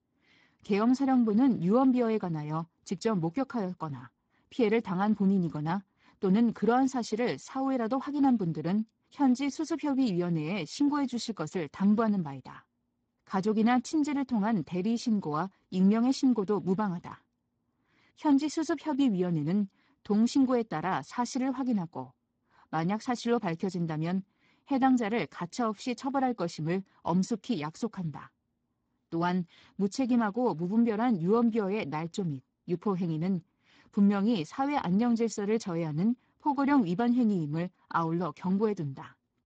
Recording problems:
garbled, watery; badly; nothing above 7.5 kHz

